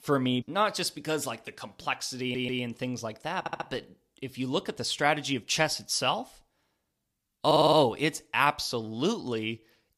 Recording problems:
audio stuttering; at 2 s, at 3.5 s and at 7.5 s

